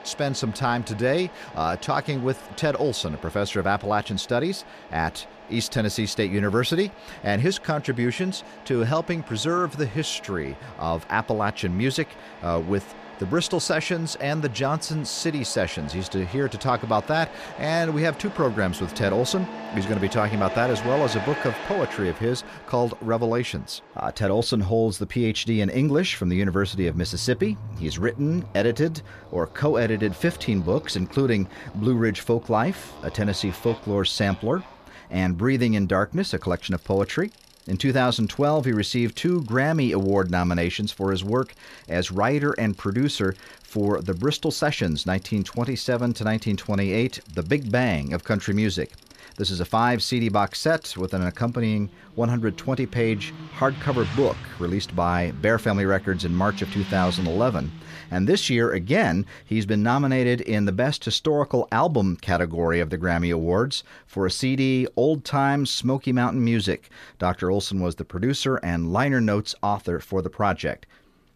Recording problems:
traffic noise; noticeable; throughout; 15 dB below the speech

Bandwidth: 14.5 kHz